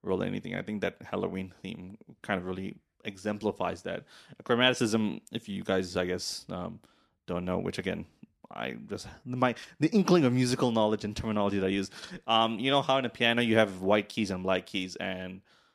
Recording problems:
none

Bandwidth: 13.5 kHz